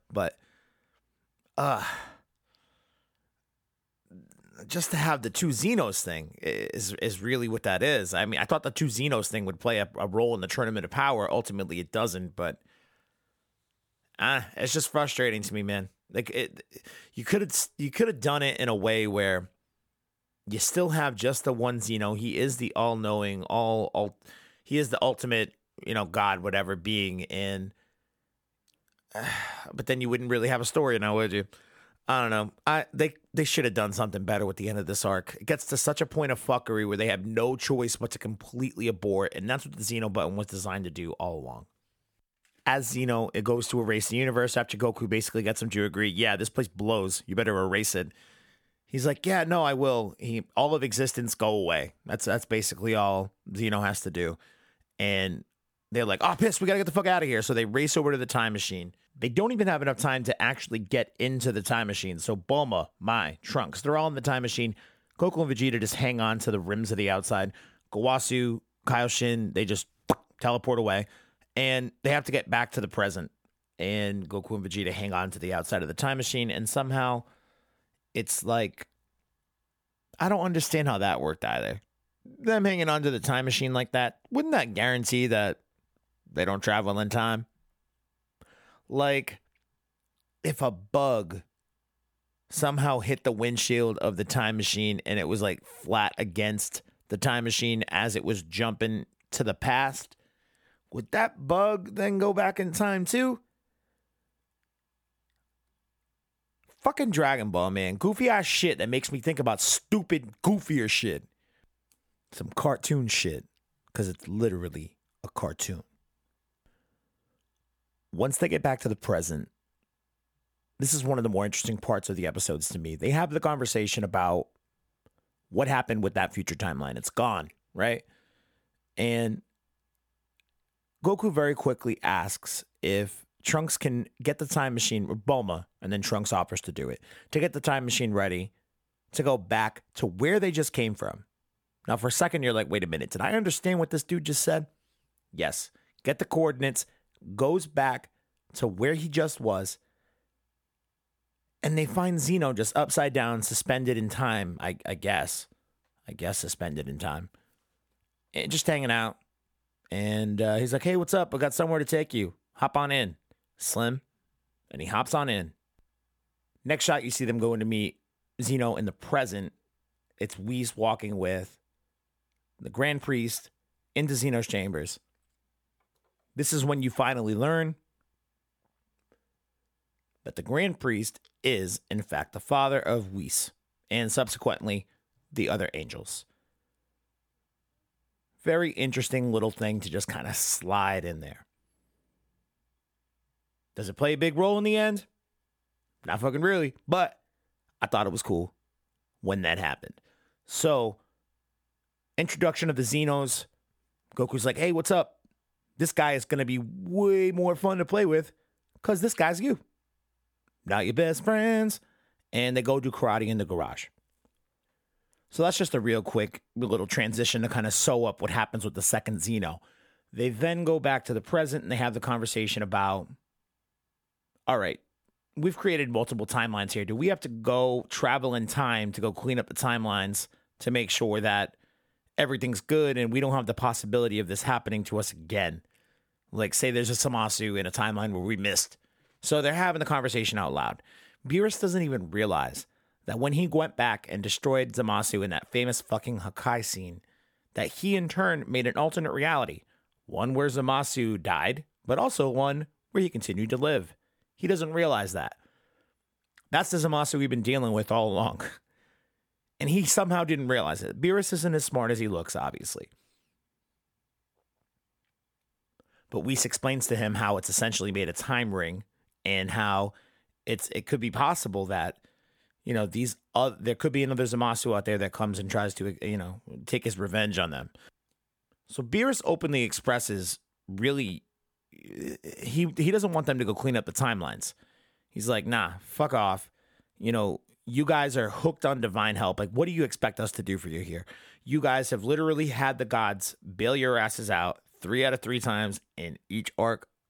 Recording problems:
none

